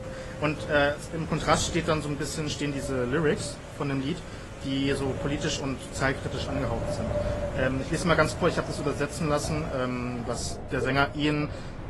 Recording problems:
garbled, watery; slightly; nothing above 11.5 kHz
rain or running water; noticeable; throughout; 15 dB below the speech
wind noise on the microphone; occasional gusts; 10 dB below the speech

